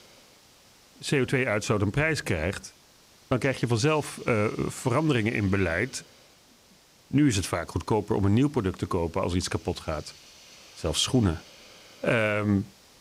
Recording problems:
hiss; faint; throughout; 25 dB below the speech

